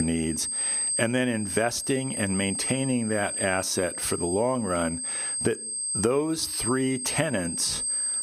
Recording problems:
squashed, flat; somewhat
high-pitched whine; loud; throughout; 8.5 kHz, 2 dB below the speech
abrupt cut into speech; at the start

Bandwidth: 15 kHz